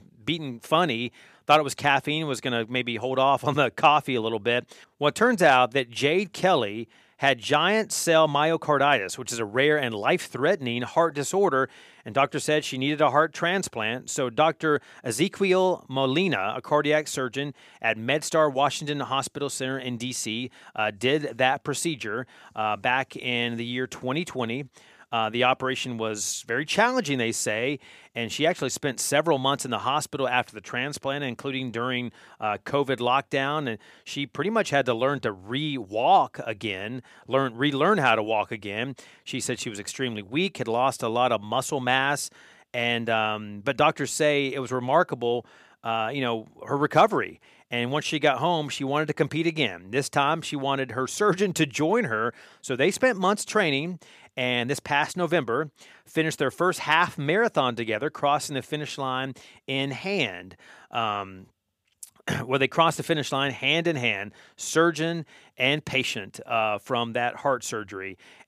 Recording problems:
none

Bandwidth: 15 kHz